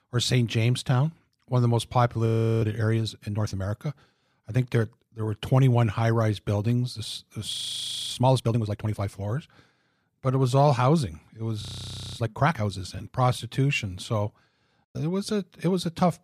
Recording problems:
audio freezing; at 2.5 s, at 7.5 s for 0.5 s and at 12 s for 0.5 s

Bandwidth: 15 kHz